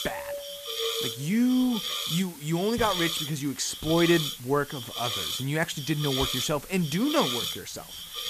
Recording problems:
hiss; loud; throughout; 4 dB below the speech
doorbell; noticeable; until 1.5 s; peak 7 dB below the speech

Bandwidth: 14.5 kHz